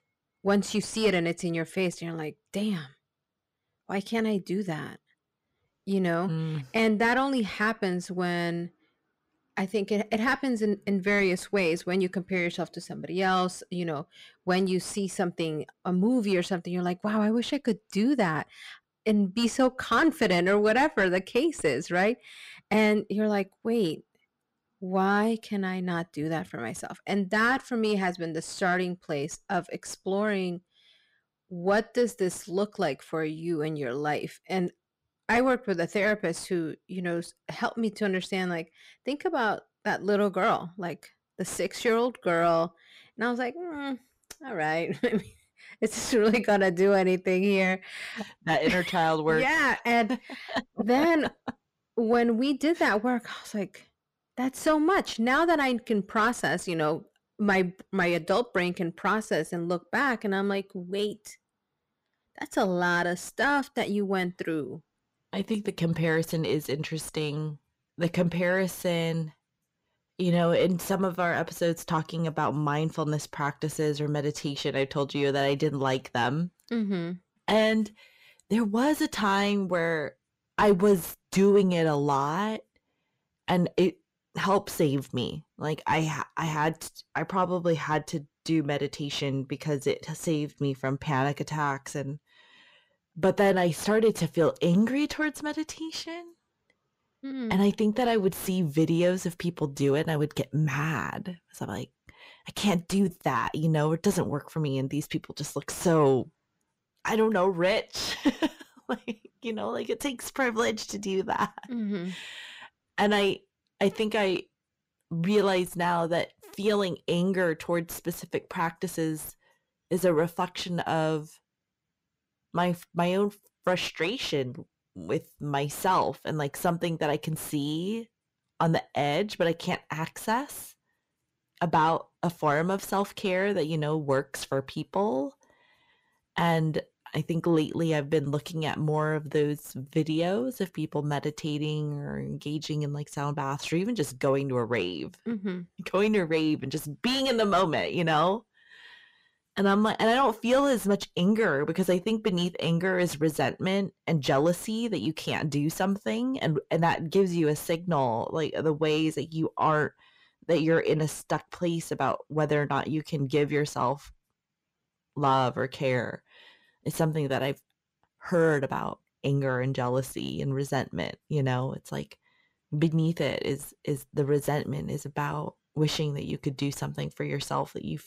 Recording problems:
distortion; slight; 10 dB below the speech

